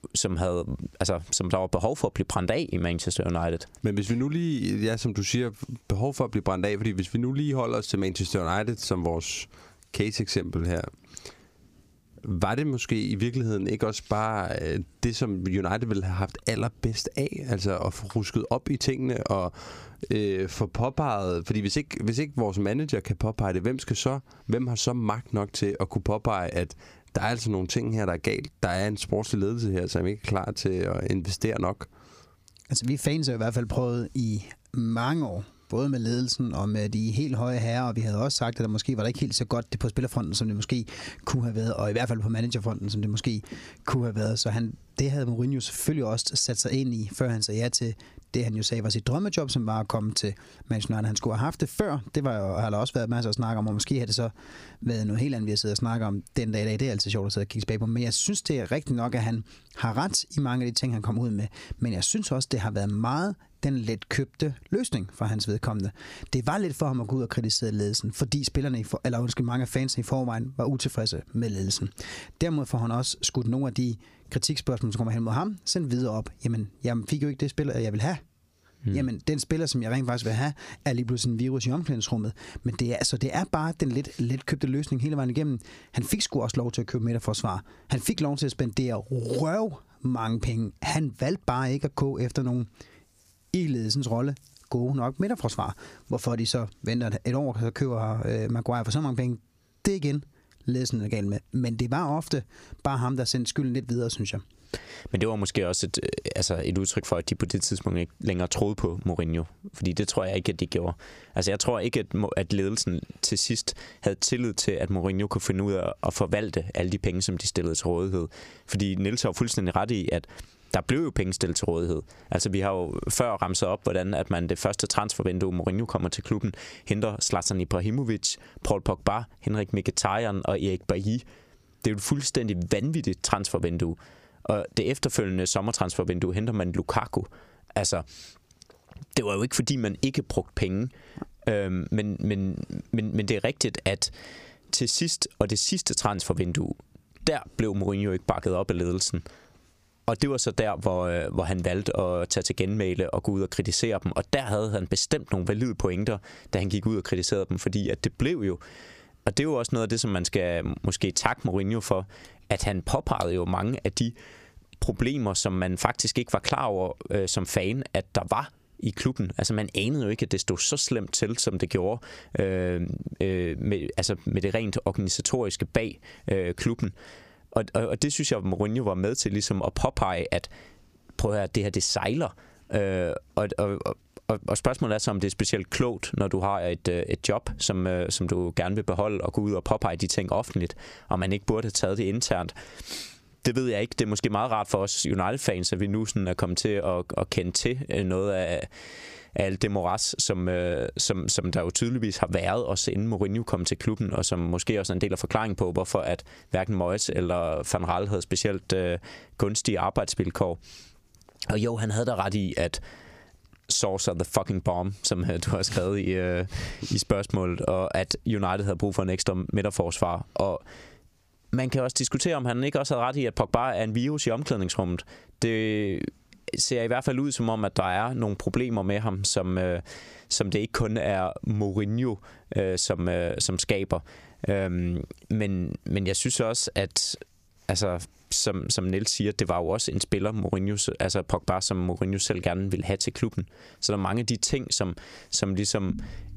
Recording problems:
squashed, flat; heavily

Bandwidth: 15 kHz